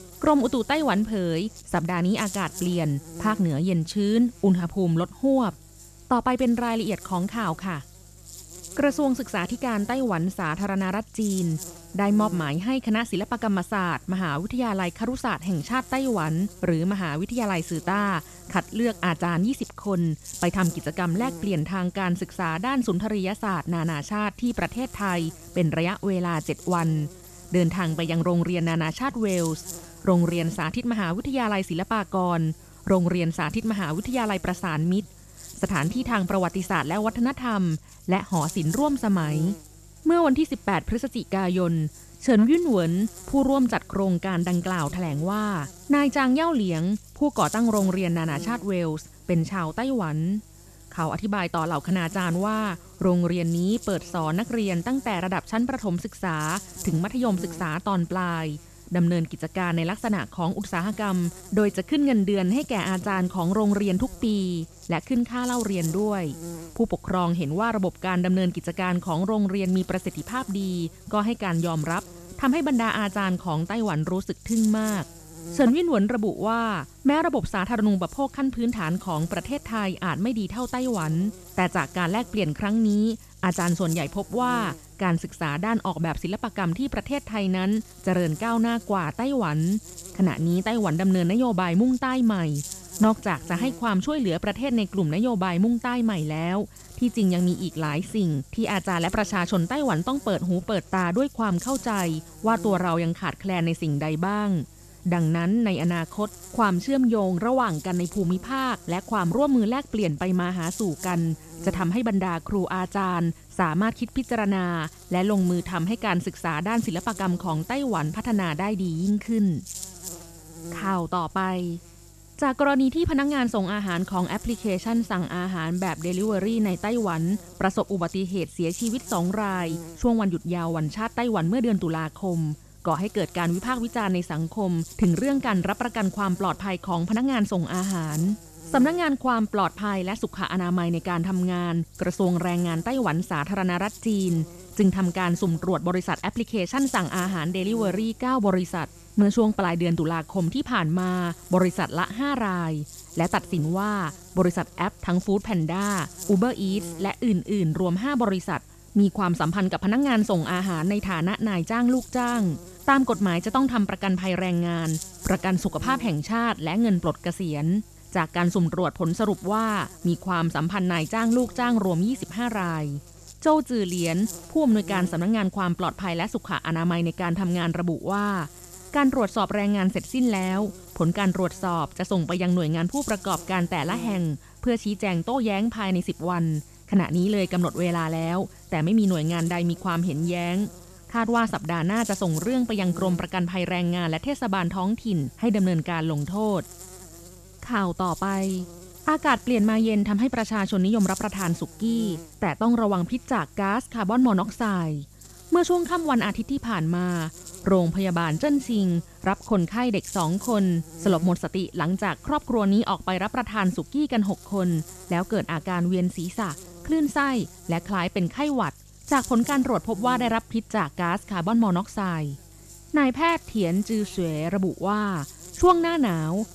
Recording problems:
electrical hum; noticeable; throughout; 50 Hz, 20 dB below the speech

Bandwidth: 13.5 kHz